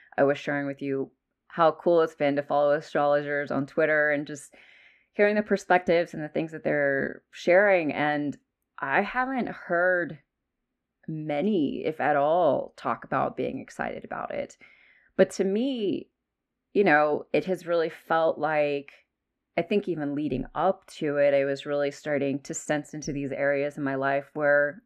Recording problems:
muffled; very; fading above 3.5 kHz

